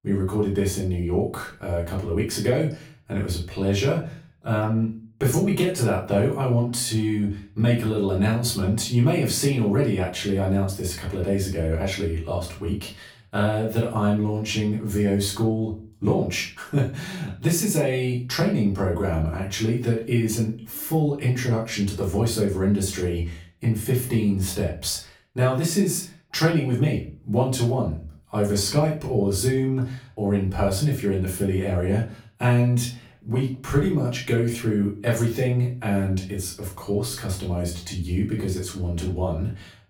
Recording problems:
off-mic speech; far
room echo; slight; dies away in 0.3 s

